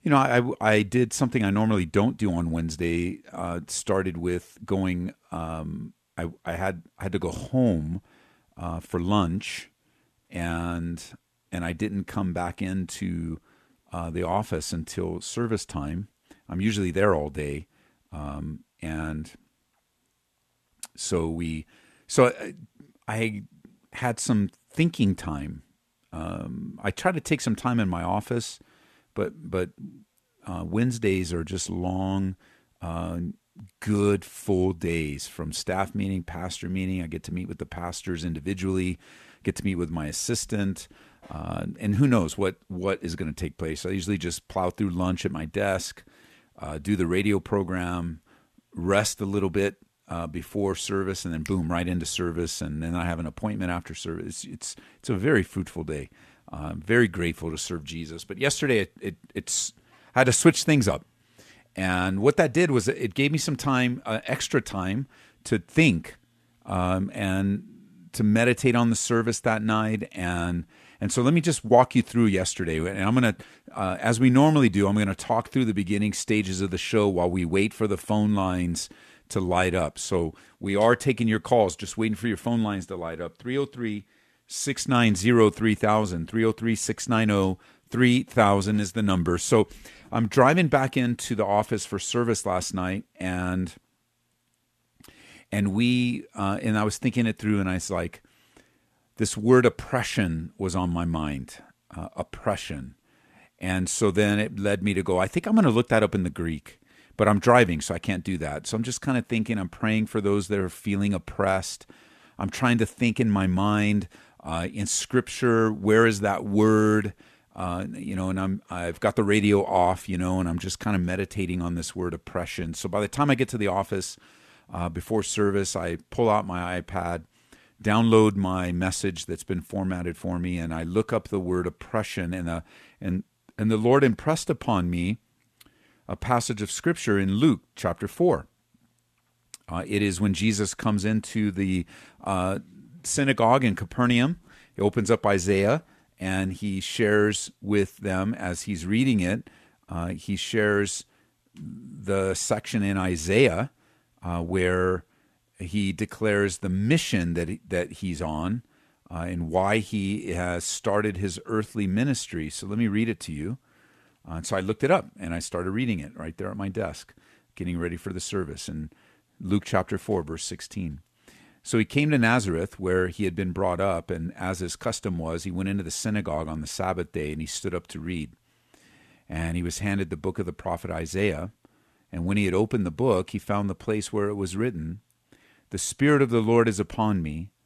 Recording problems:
none

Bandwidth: 13.5 kHz